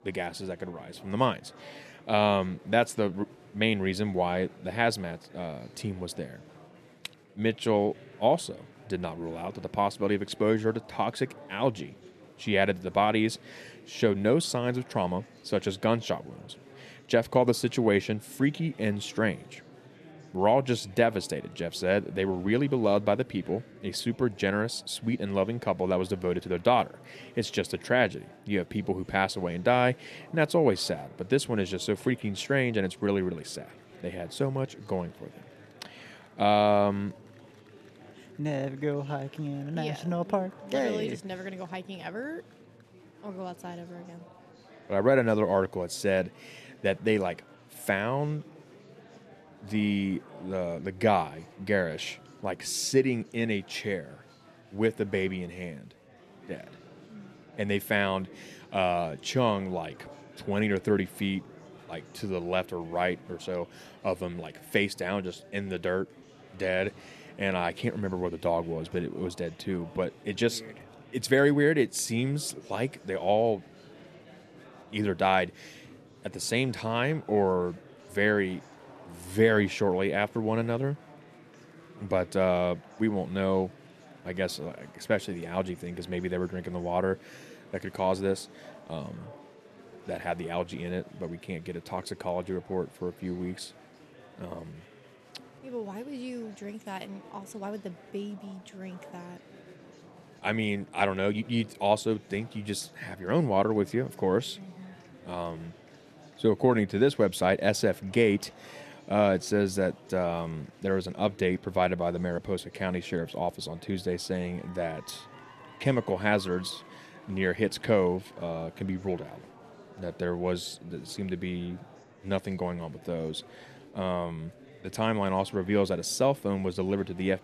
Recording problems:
chatter from many people; faint; throughout; 25 dB below the speech

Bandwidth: 13.5 kHz